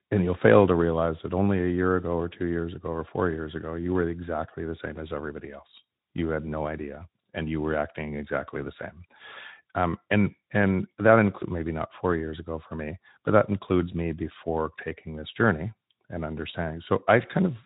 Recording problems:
high frequencies cut off; severe; nothing above 4 kHz
garbled, watery; slightly

